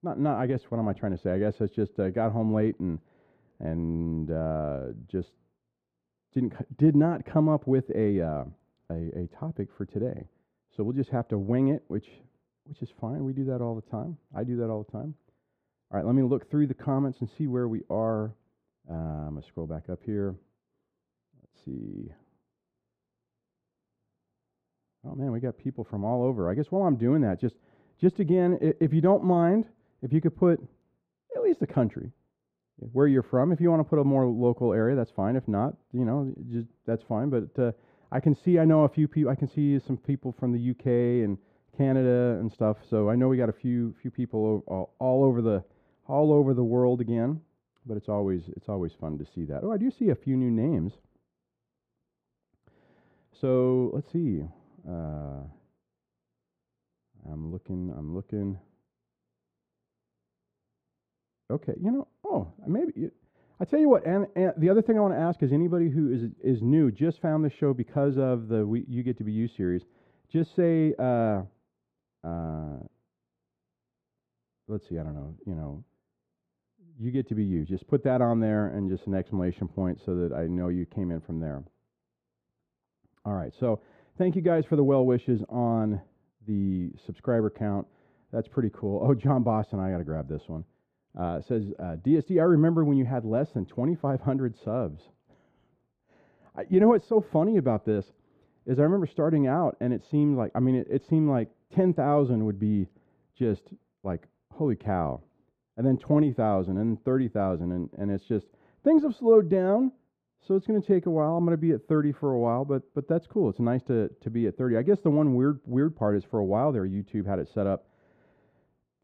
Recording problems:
muffled; very; fading above 1.5 kHz

